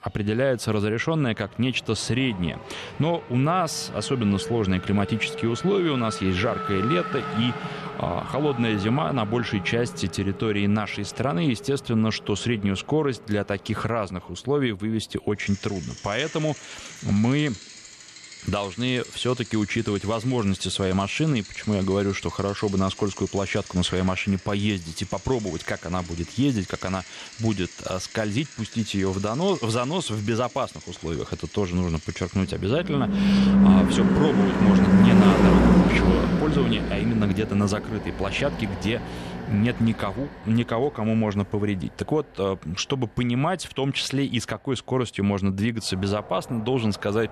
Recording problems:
traffic noise; very loud; throughout; 2 dB above the speech

